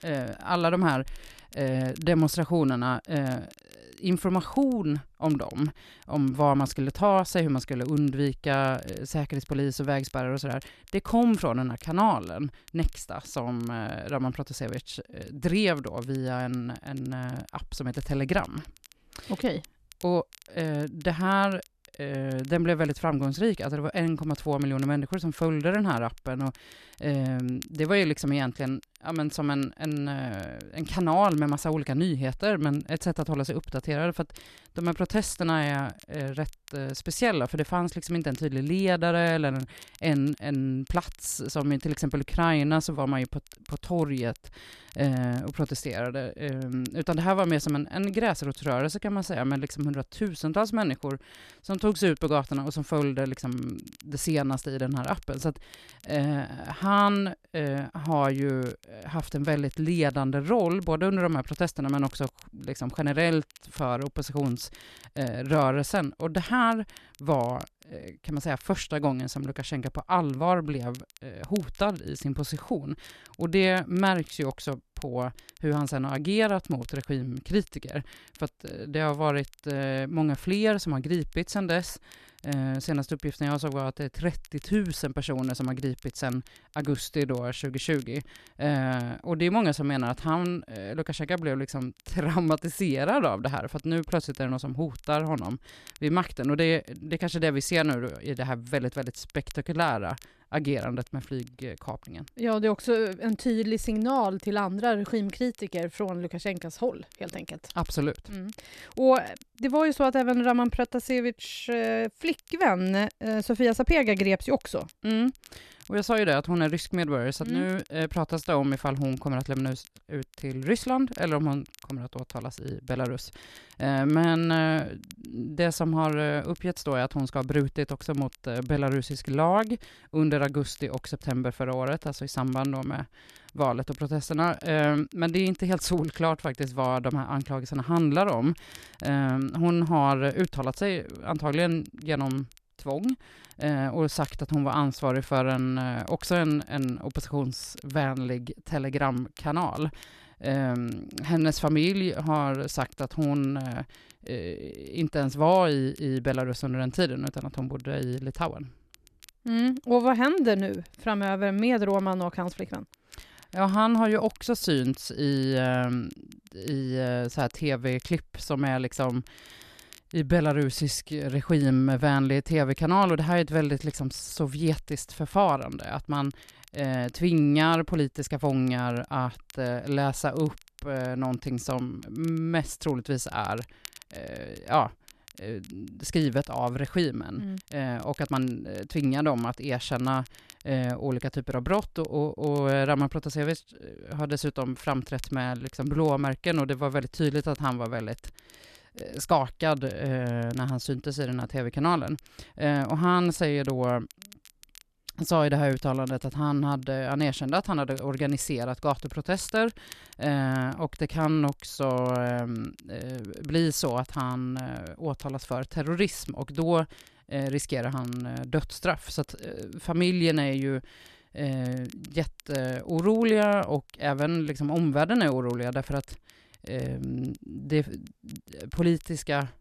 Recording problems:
crackle, like an old record; faint; 25 dB below the speech

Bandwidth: 13.5 kHz